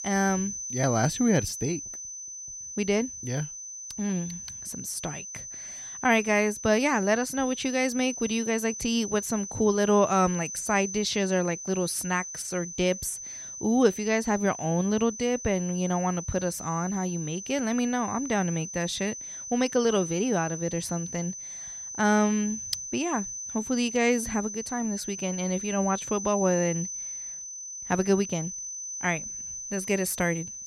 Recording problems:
high-pitched whine; loud; throughout; 6 kHz, 8 dB below the speech

